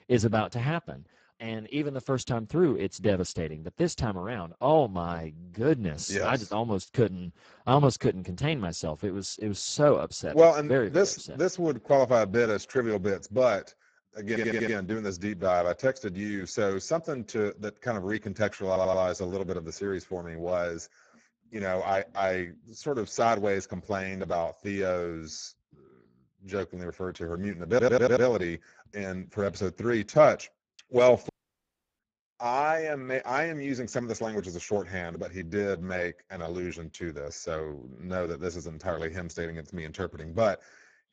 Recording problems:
garbled, watery; badly; nothing above 7.5 kHz
audio stuttering; at 14 s, at 19 s and at 28 s
audio cutting out; at 31 s for 0.5 s

